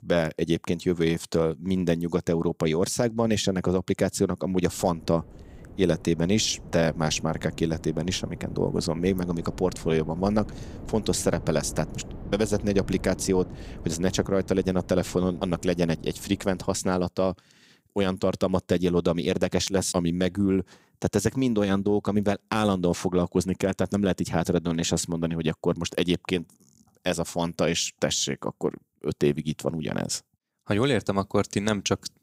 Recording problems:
wind noise on the microphone; occasional gusts; from 4.5 to 17 s; 20 dB below the speech

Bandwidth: 15.5 kHz